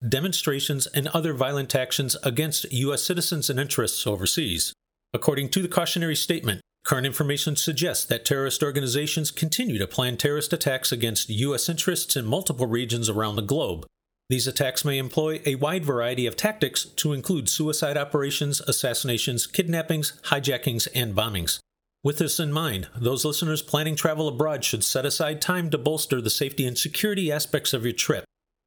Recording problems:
squashed, flat; somewhat

